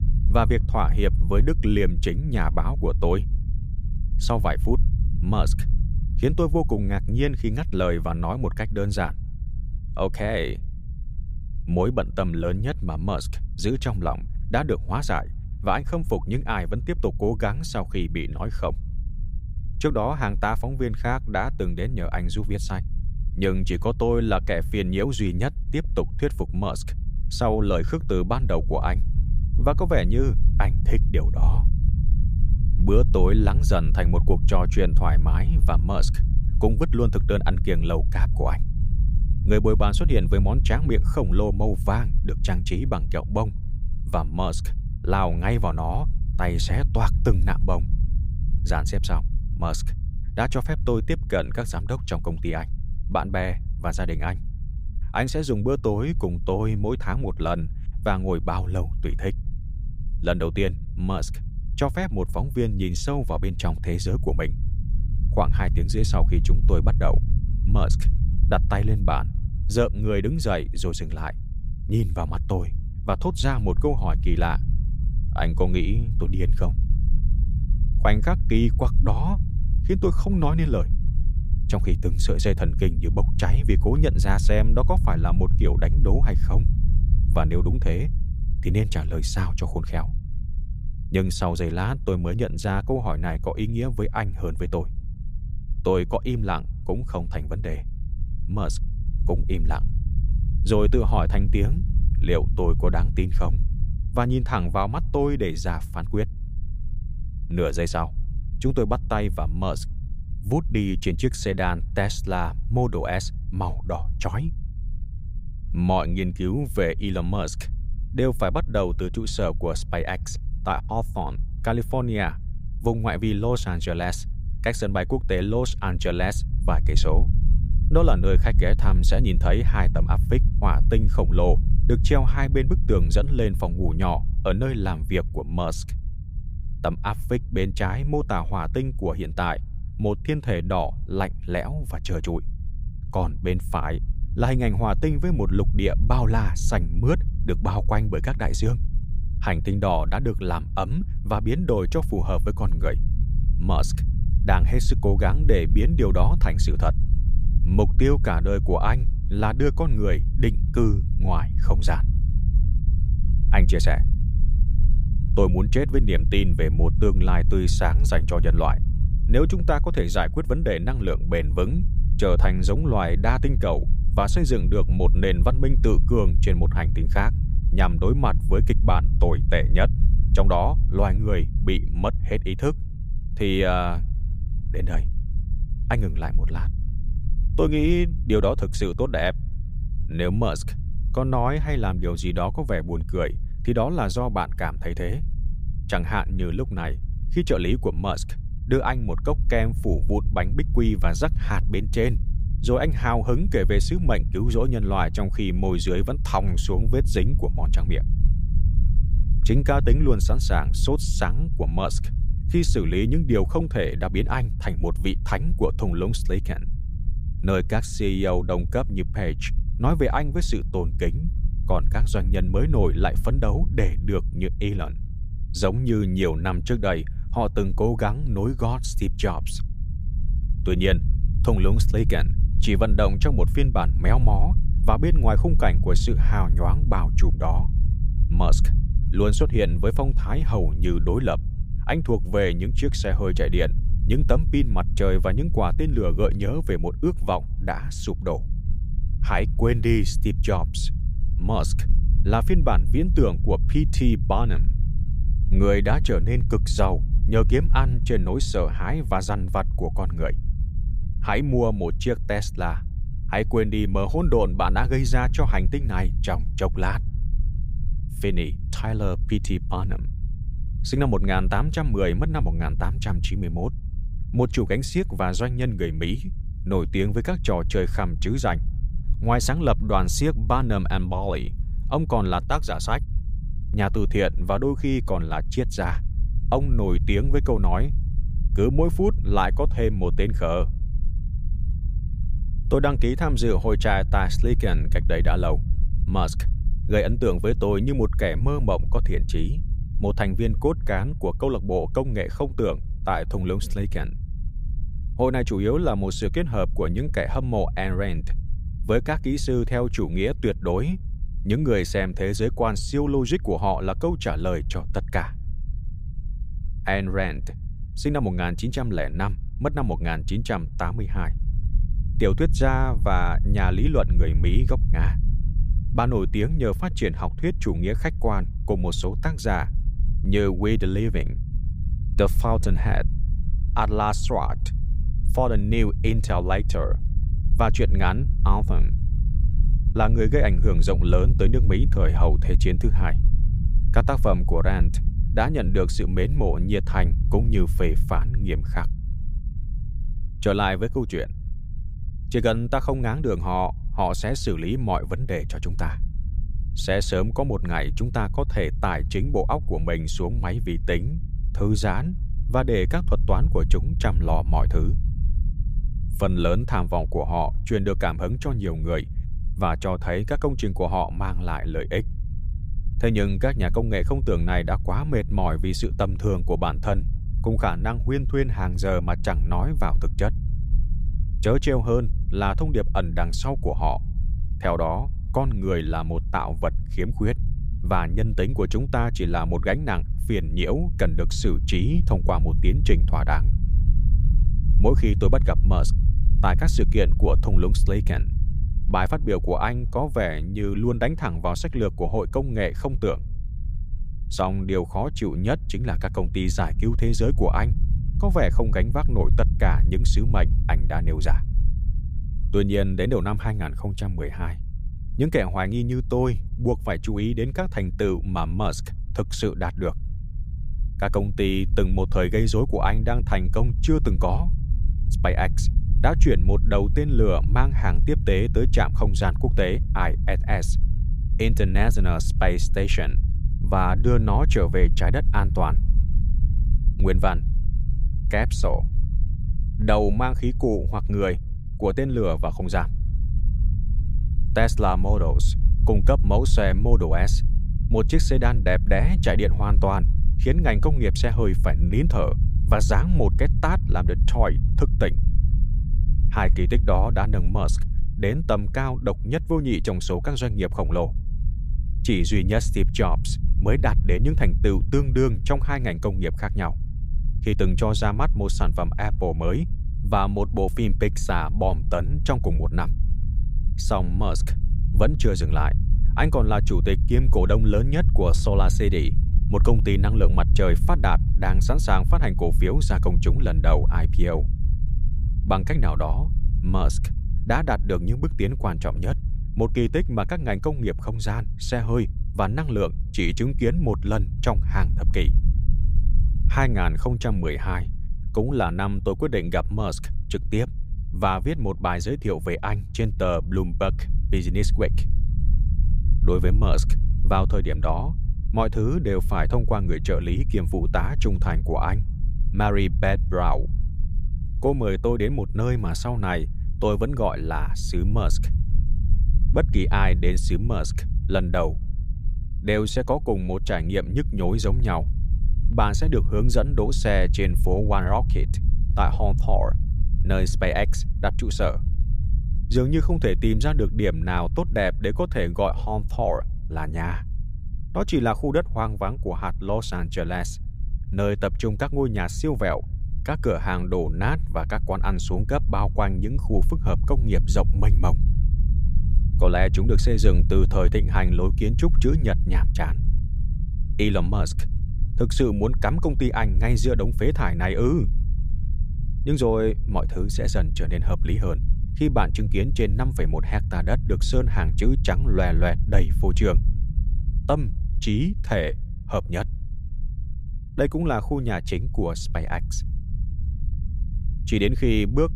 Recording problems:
low rumble; noticeable; throughout; 15 dB below the speech

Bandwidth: 15.5 kHz